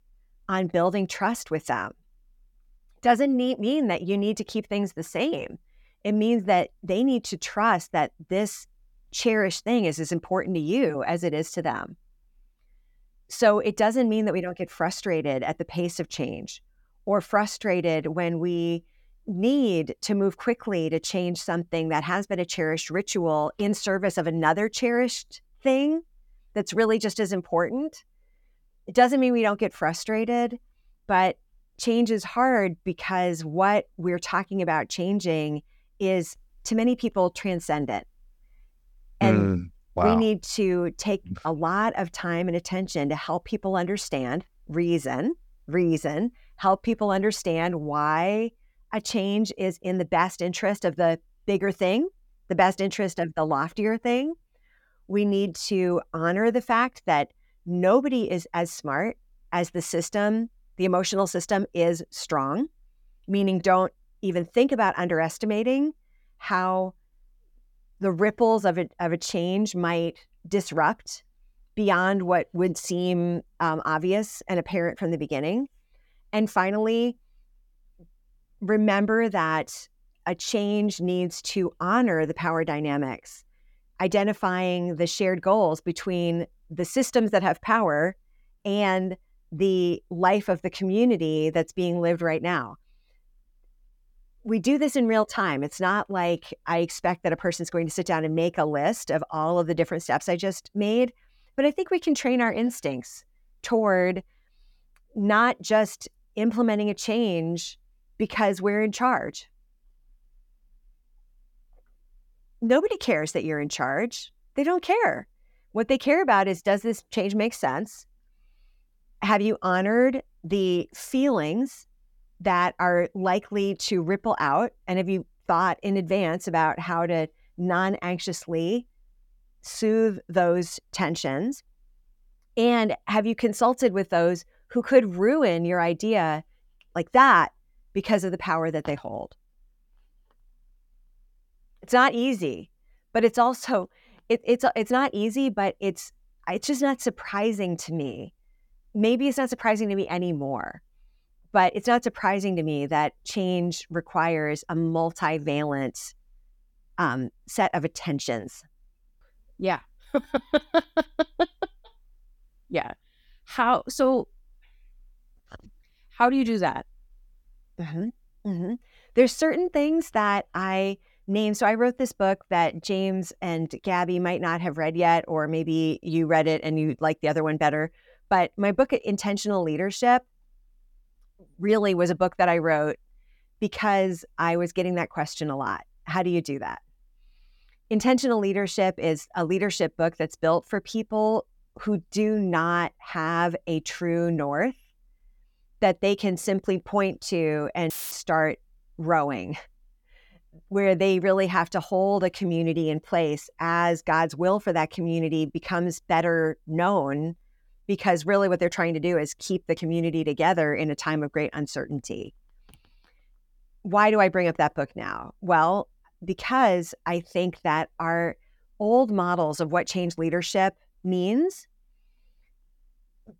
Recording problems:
audio cutting out; filled with static; at 3:18

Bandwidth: 18 kHz